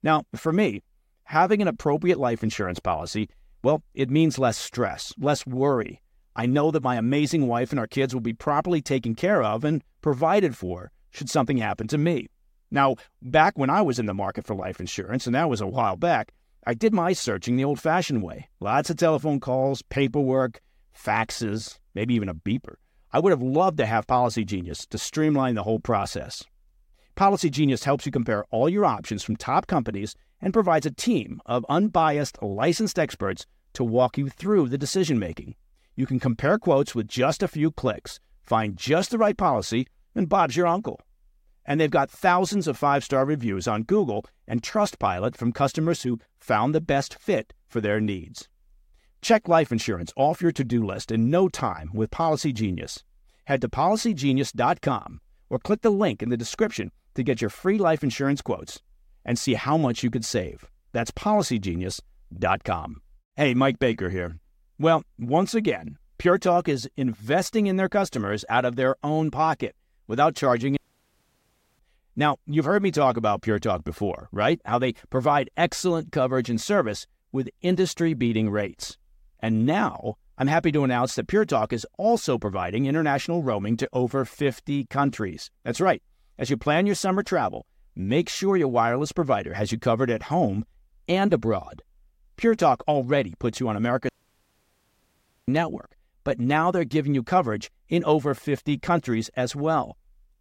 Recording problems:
audio cutting out; at 1:11 for 1 s and at 1:34 for 1.5 s

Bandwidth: 16 kHz